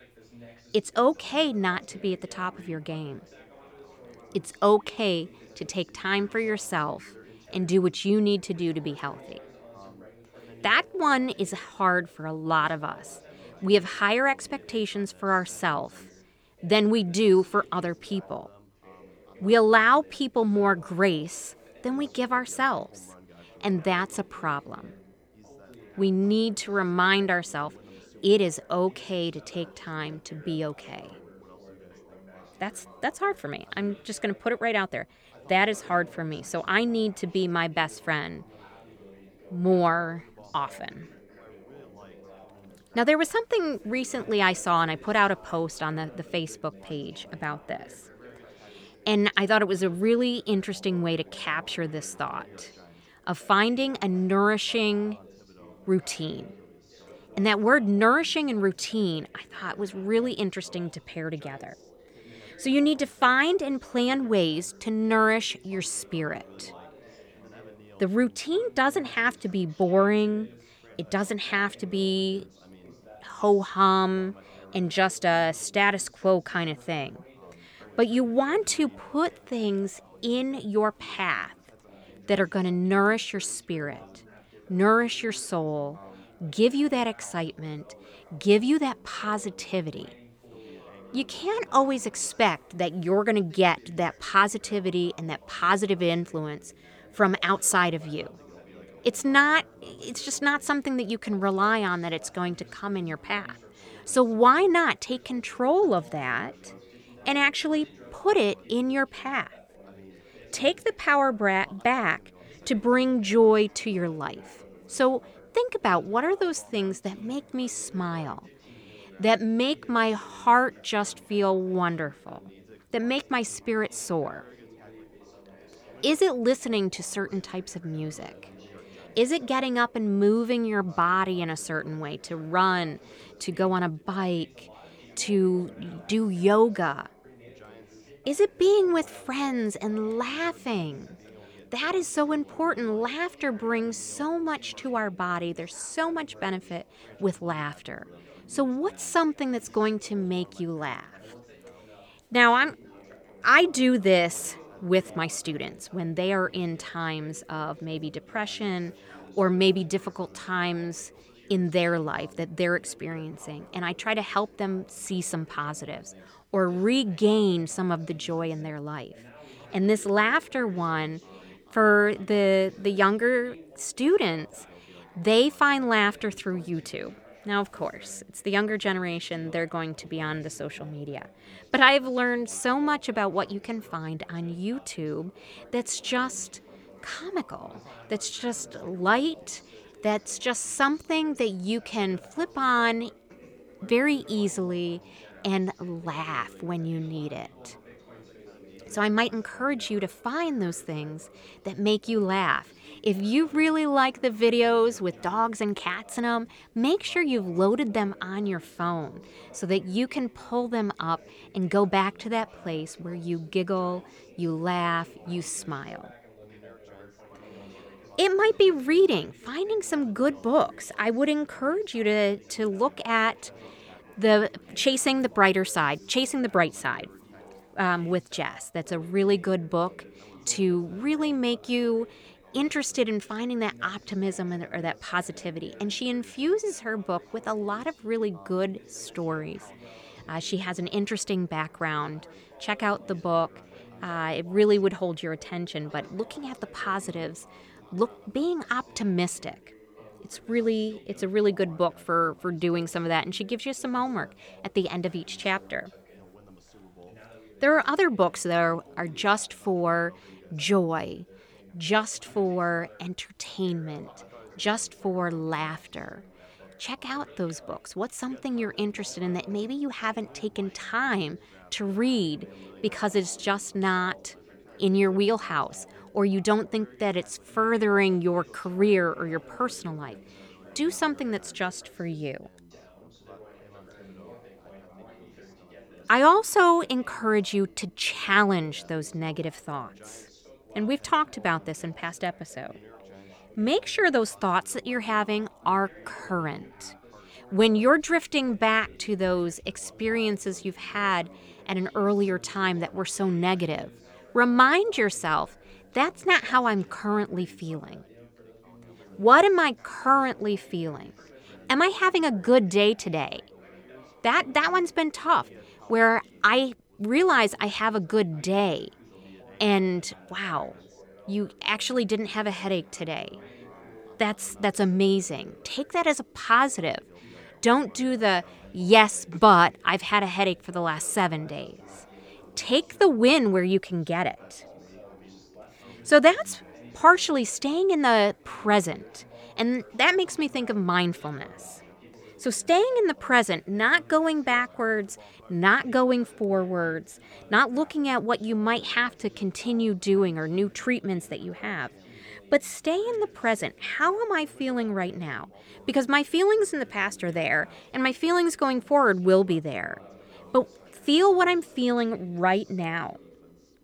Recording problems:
background chatter; faint; throughout; 3 voices, 25 dB below the speech

